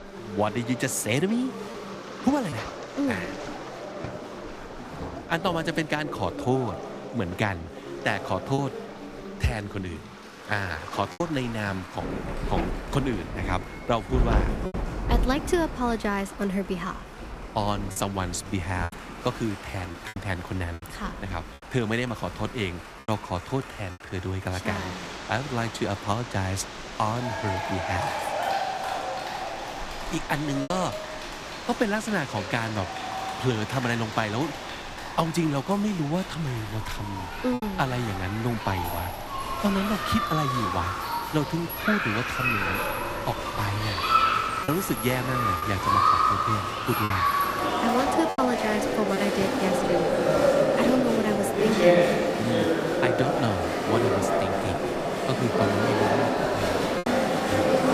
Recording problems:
crowd noise; very loud; throughout; 2 dB above the speech
rain or running water; loud; throughout; 9 dB below the speech
choppy; occasionally; 2% of the speech affected

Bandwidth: 15 kHz